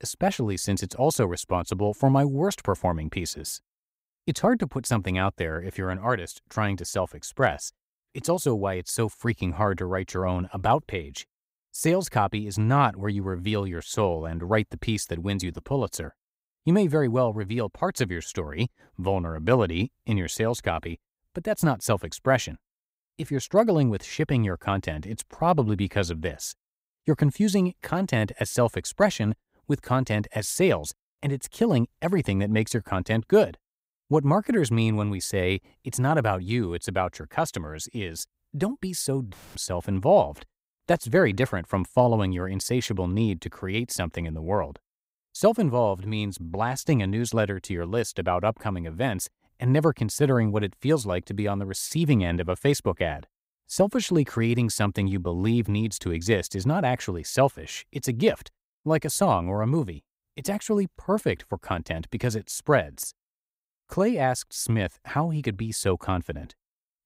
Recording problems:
none

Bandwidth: 15.5 kHz